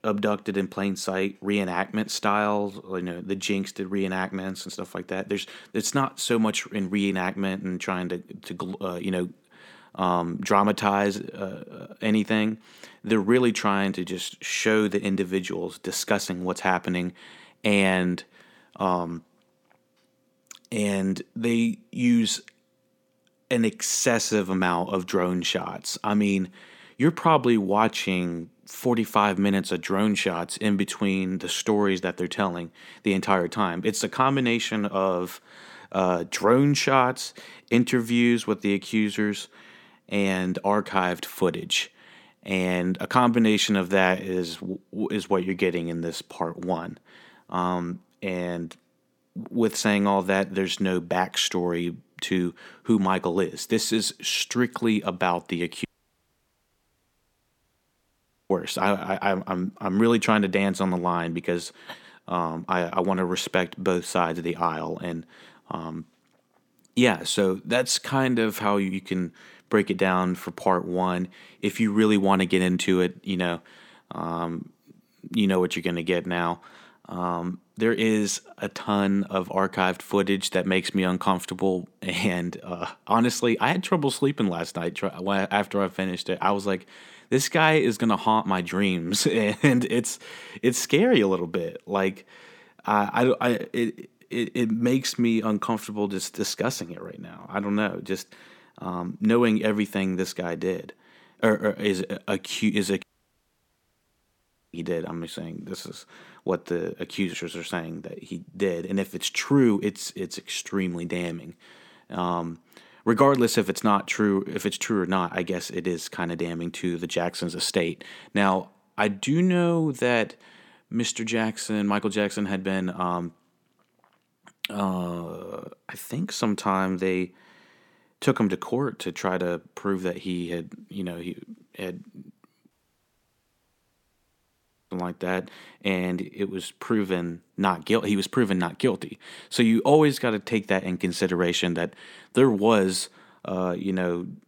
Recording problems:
audio cutting out; at 56 s for 2.5 s, at 1:43 for 1.5 s and at 2:13 for 2 s

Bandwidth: 17.5 kHz